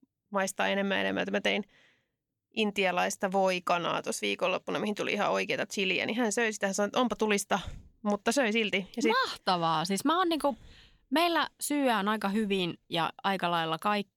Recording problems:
none

